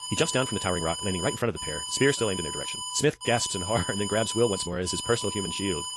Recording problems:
wrong speed, natural pitch; too fast; 1.6 times normal speed
garbled, watery; slightly; nothing above 11 kHz
alarm; noticeable; peak 4 dB below the speech

